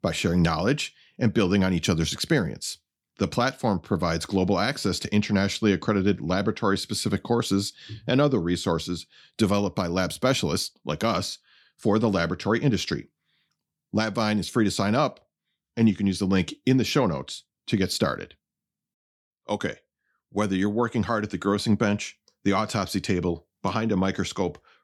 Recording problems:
none

